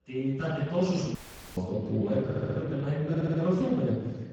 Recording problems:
off-mic speech; far
garbled, watery; badly
room echo; noticeable; dies away in 1.1 s
audio cutting out; at 1 s
audio stuttering; at 2.5 s and at 3 s

